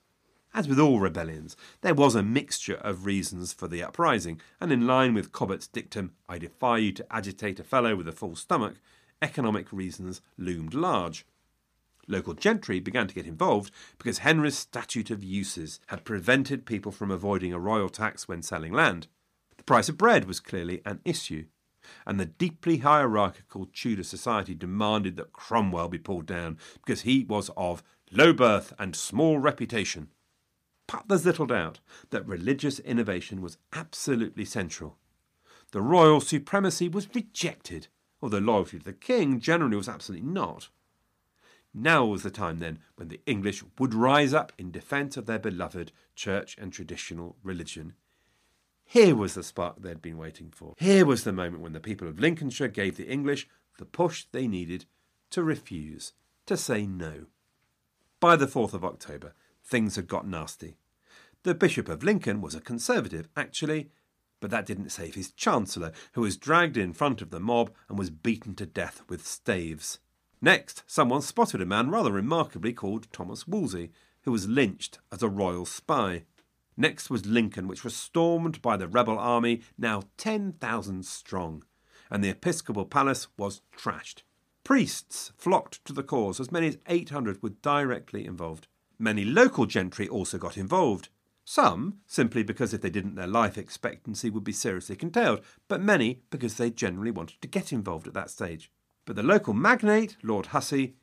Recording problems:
none

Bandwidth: 15 kHz